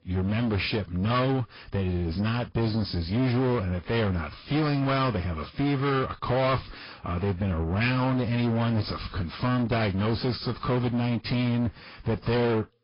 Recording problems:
distortion; heavy; 7 dB below the speech
high frequencies cut off; noticeable; nothing above 5 kHz
garbled, watery; slightly

